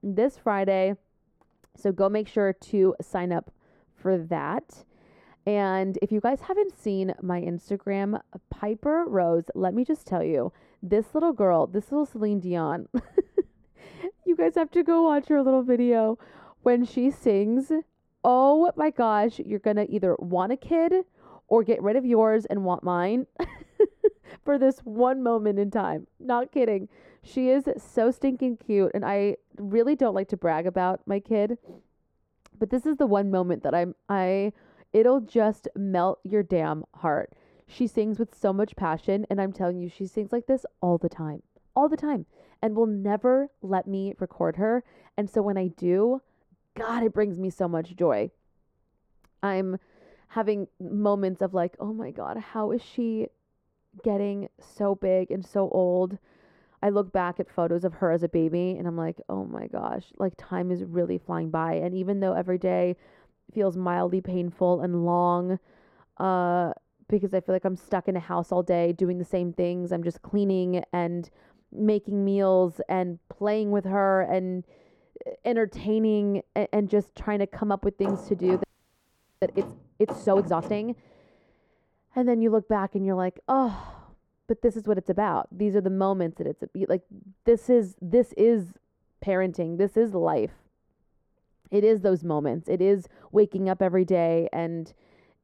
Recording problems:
muffled; very; fading above 1.5 kHz
door banging; faint; from 1:18 to 1:21; peak 10 dB below the speech
audio freezing; at 1:19 for 1 s

